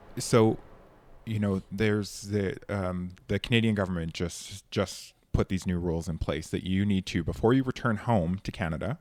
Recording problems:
train or aircraft noise; faint; throughout; 30 dB below the speech

